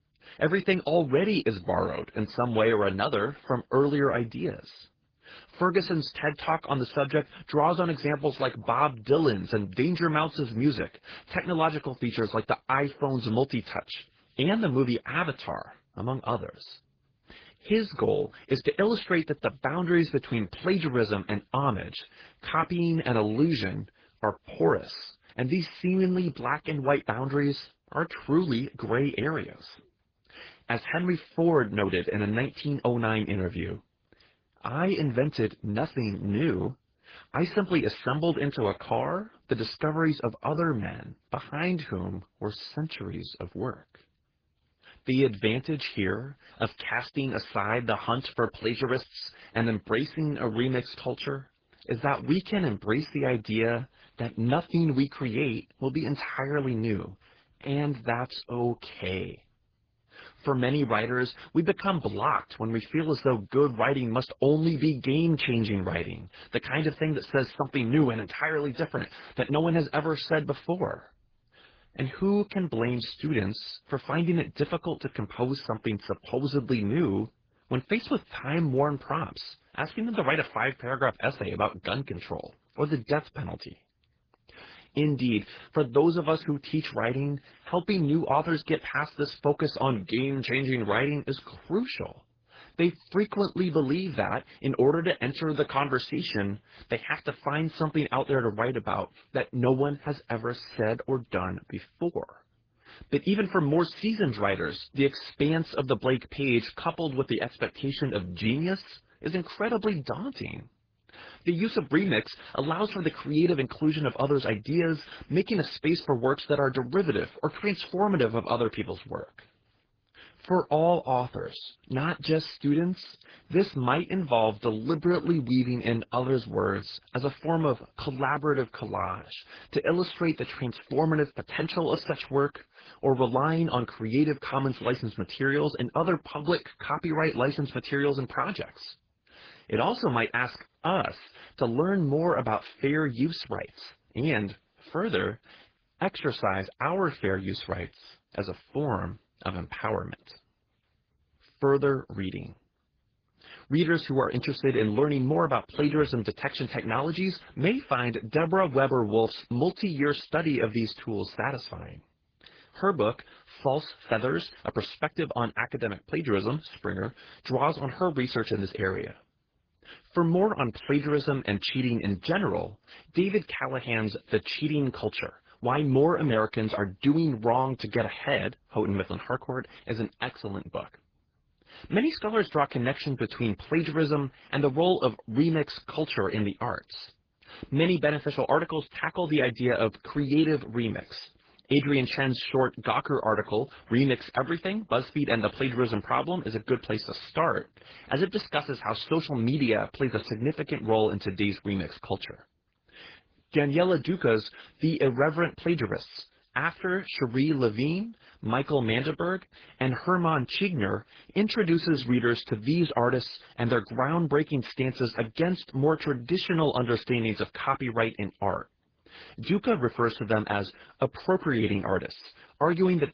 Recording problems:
garbled, watery; badly

